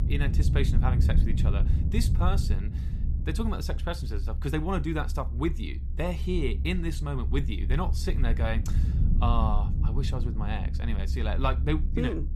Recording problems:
low rumble; loud; throughout; 10 dB below the speech

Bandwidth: 13.5 kHz